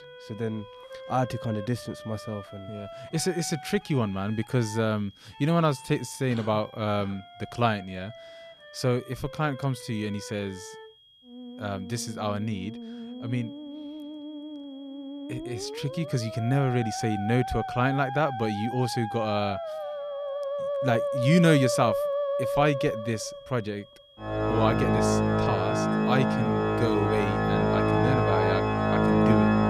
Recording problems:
background music; very loud; throughout; as loud as the speech
high-pitched whine; faint; throughout; 3.5 kHz, 25 dB below the speech

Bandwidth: 14.5 kHz